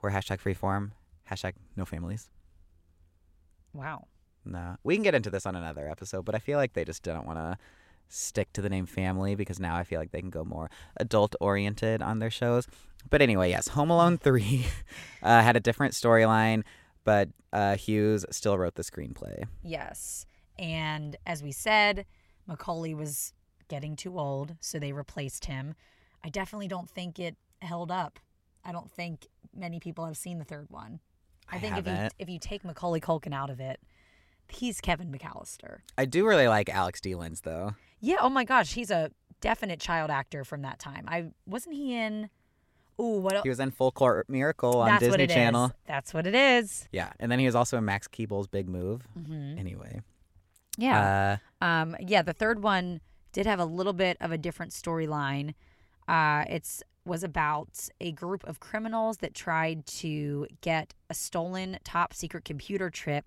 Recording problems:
none

